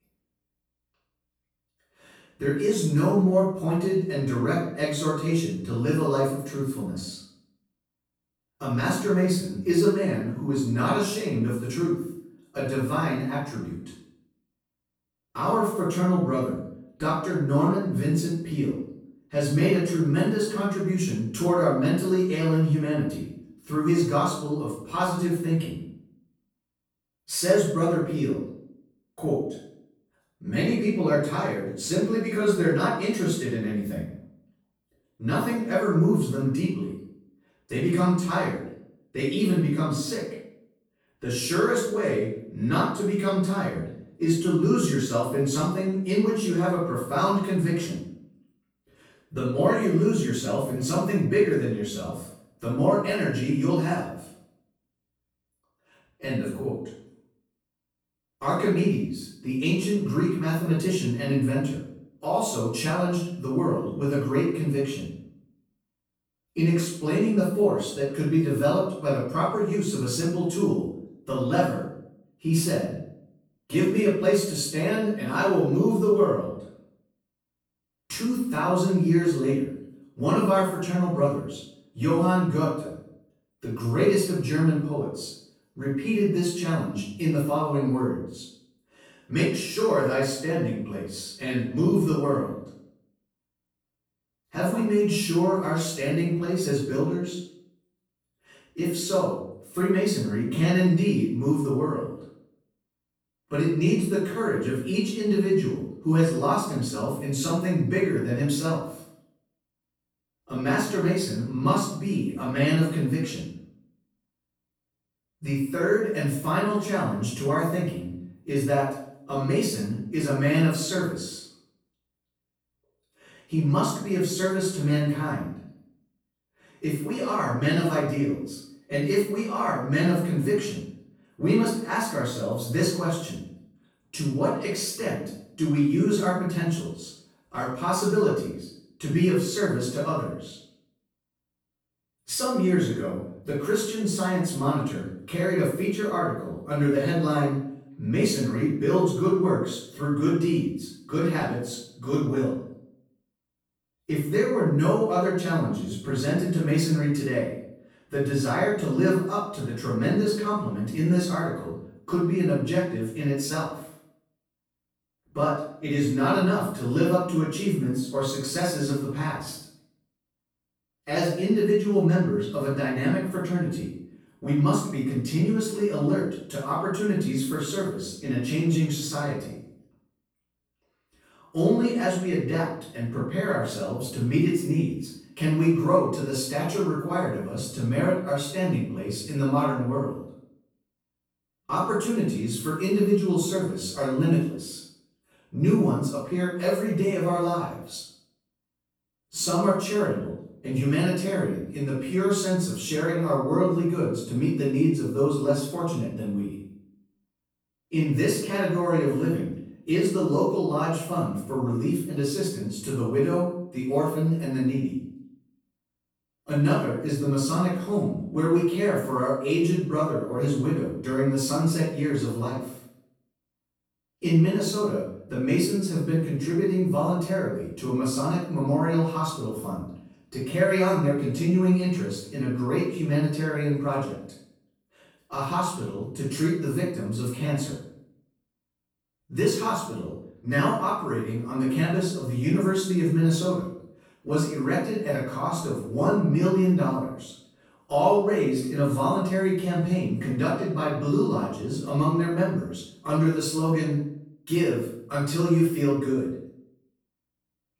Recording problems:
off-mic speech; far
room echo; noticeable; dies away in 0.6 s

